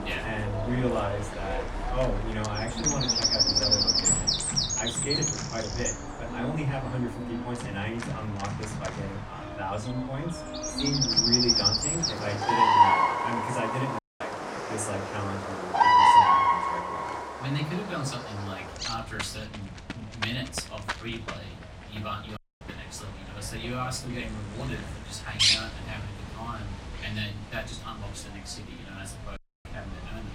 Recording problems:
off-mic speech; far
room echo; very slight; dies away in 0.2 s
animal sounds; very loud; throughout; 10 dB above the speech
background music; loud; throughout; 5 dB below the speech
audio cutting out; at 14 s, at 22 s and at 29 s

